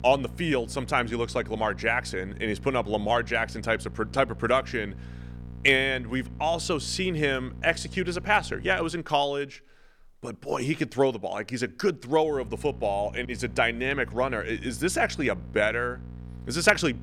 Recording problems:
electrical hum; faint; until 9 s and from 12 s on; 60 Hz, 25 dB below the speech

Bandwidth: 18.5 kHz